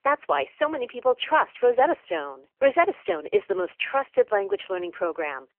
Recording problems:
phone-call audio; poor line; nothing above 3 kHz

